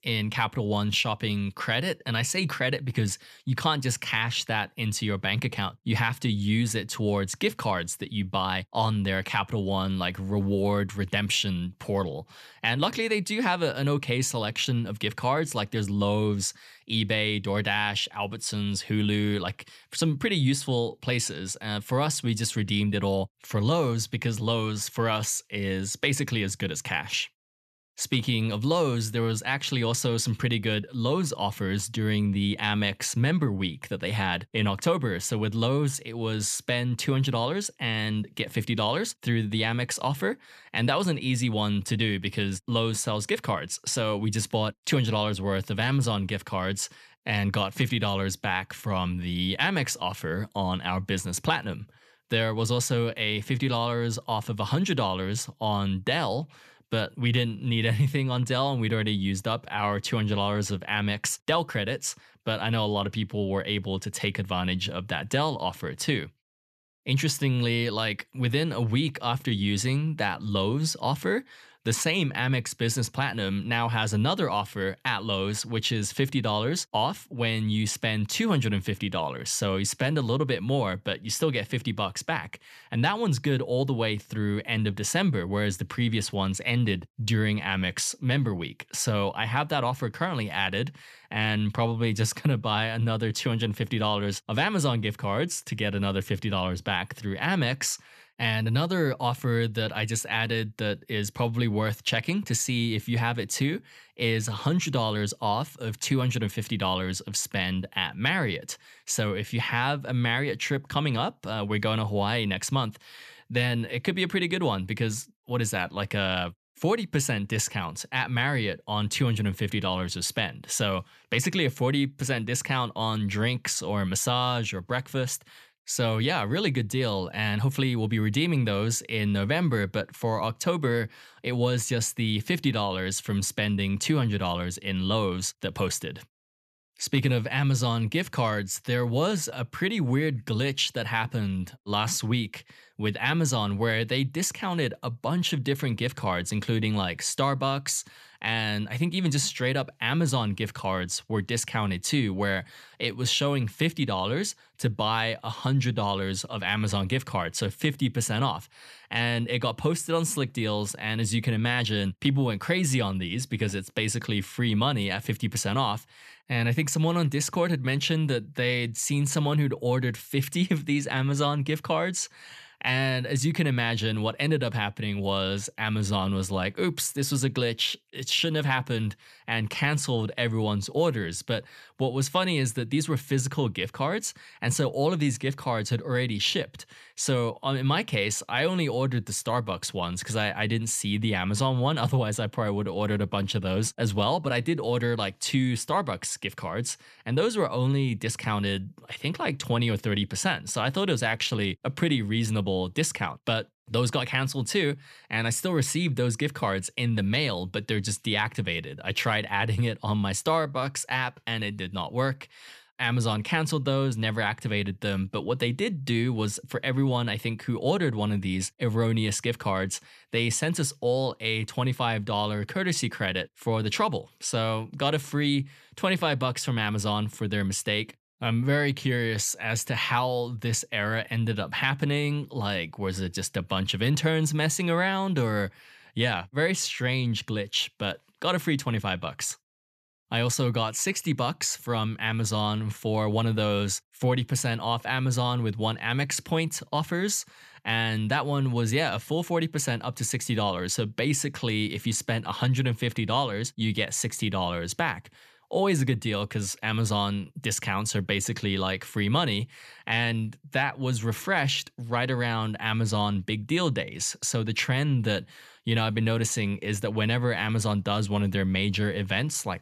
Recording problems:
none

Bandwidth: 14 kHz